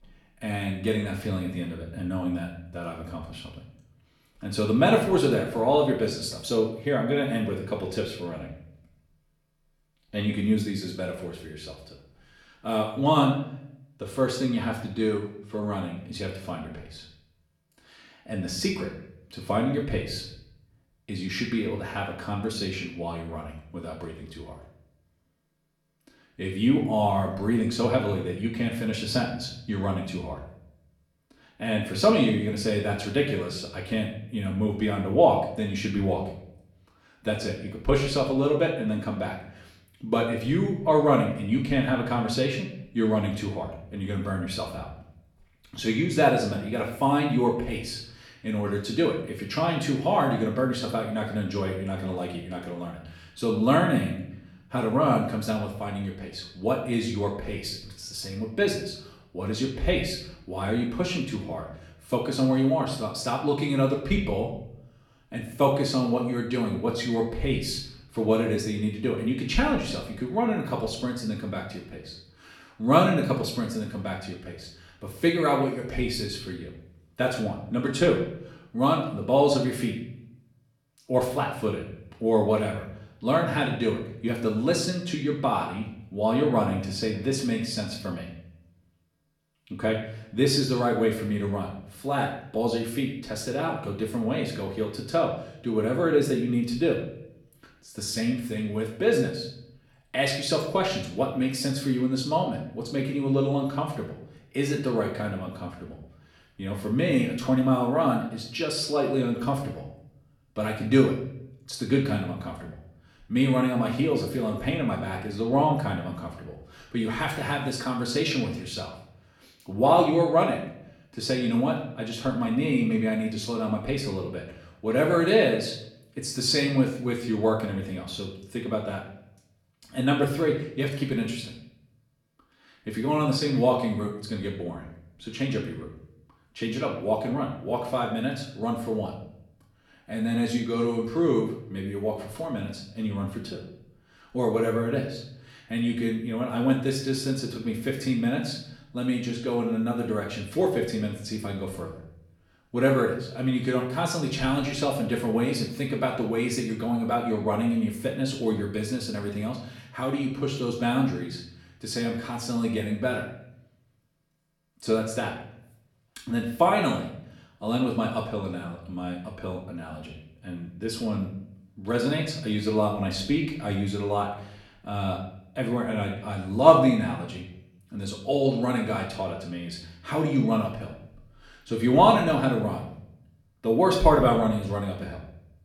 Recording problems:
off-mic speech; far
room echo; noticeable; dies away in 0.6 s

